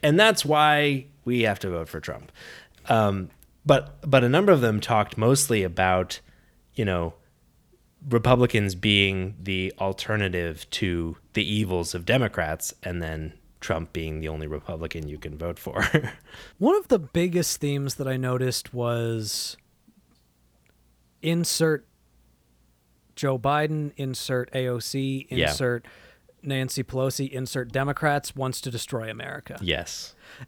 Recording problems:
none

